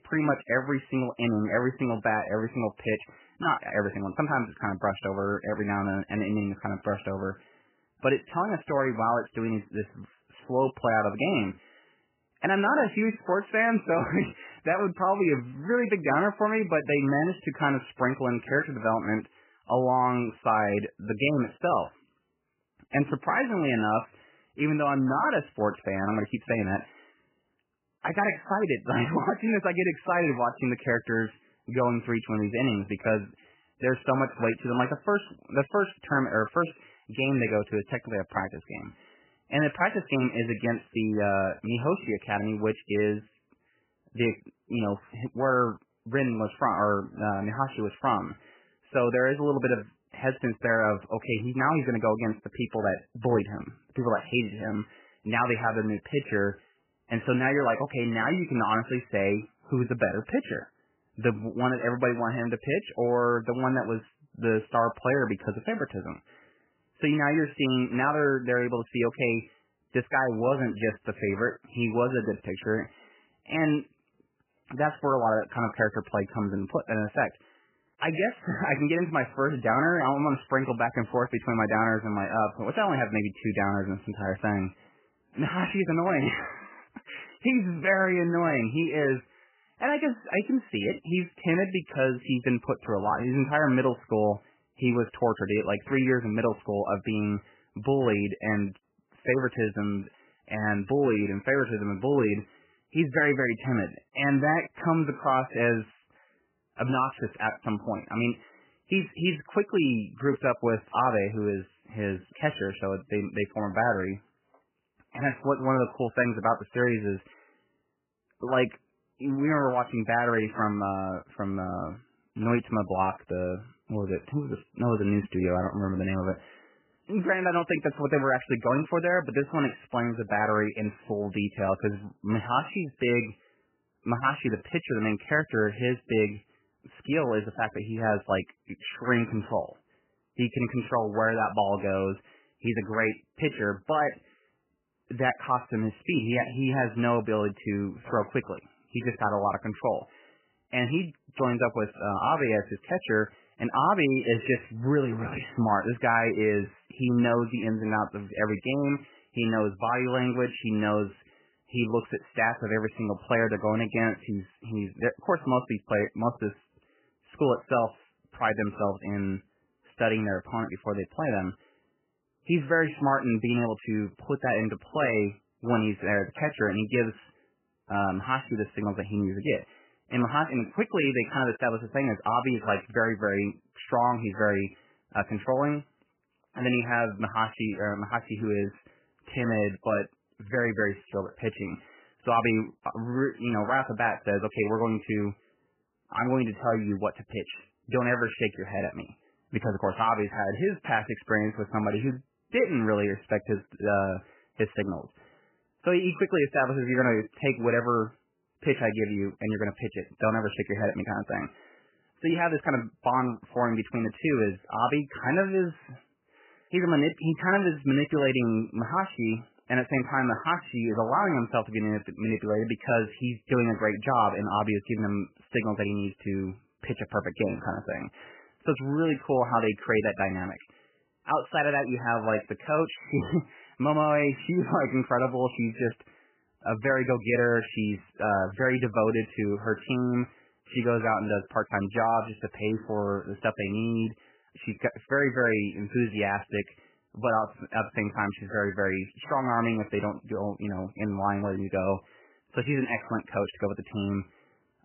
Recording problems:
garbled, watery; badly; nothing above 3 kHz

